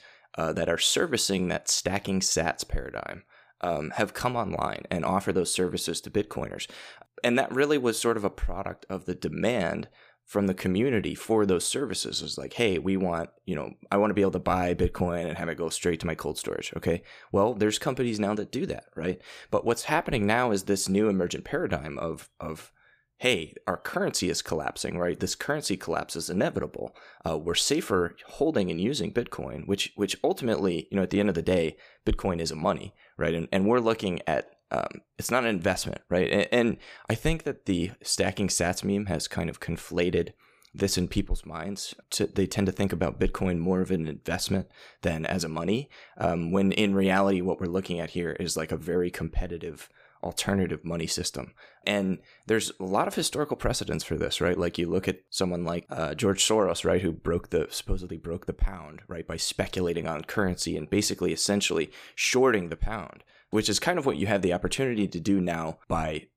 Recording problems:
none

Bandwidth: 15 kHz